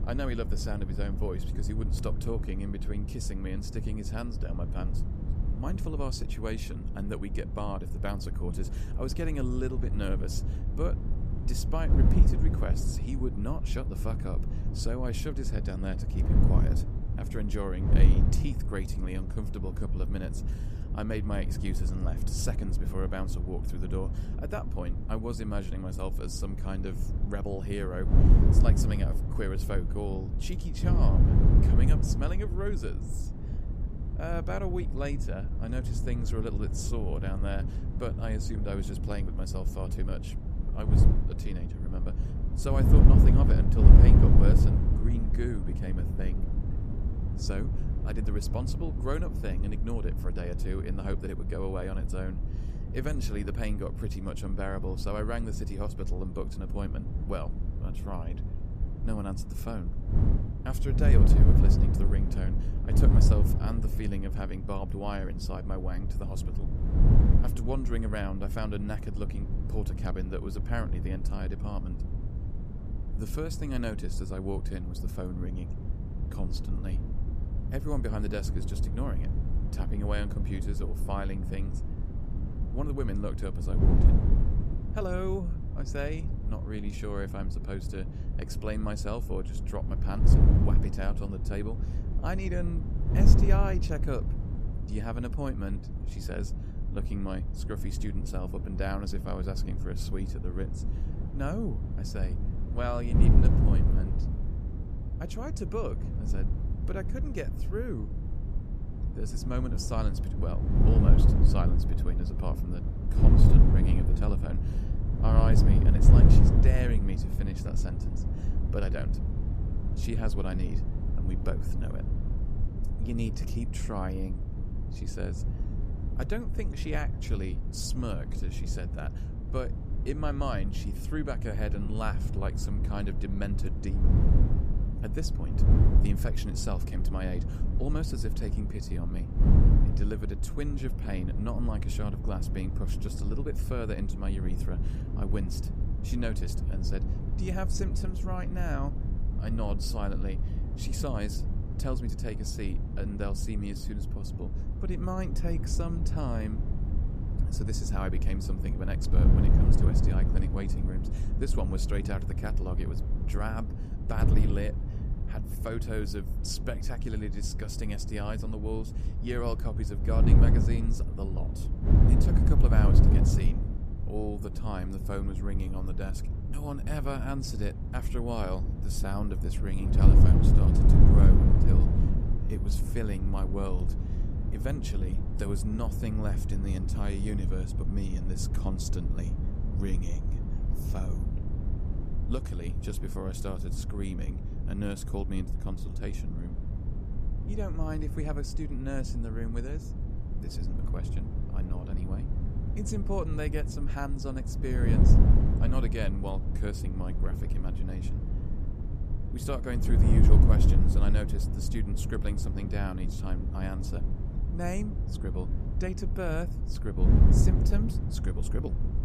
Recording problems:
wind noise on the microphone; heavy; 3 dB below the speech

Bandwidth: 14.5 kHz